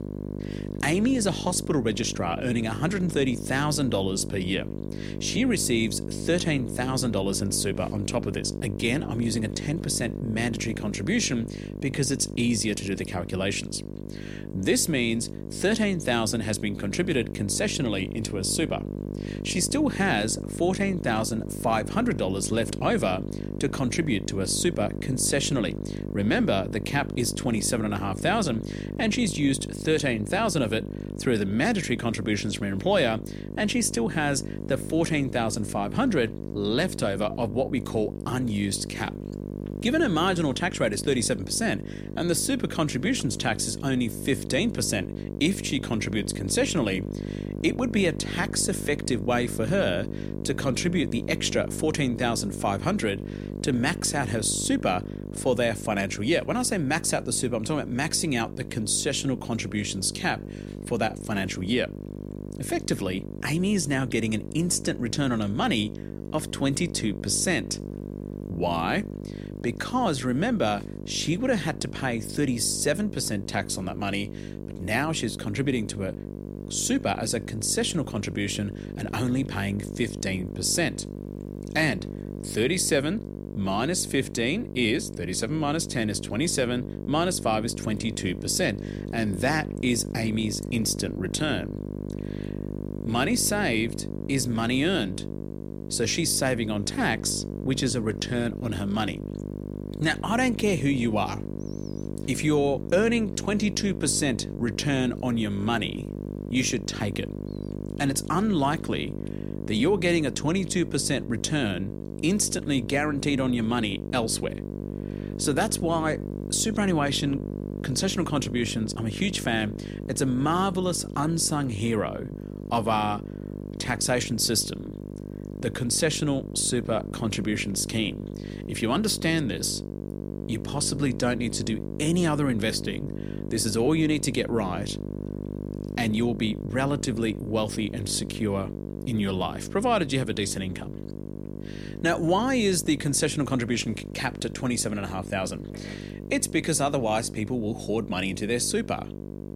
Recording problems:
electrical hum; noticeable; throughout; 50 Hz, 15 dB below the speech

